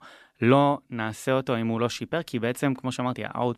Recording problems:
none

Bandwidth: 14 kHz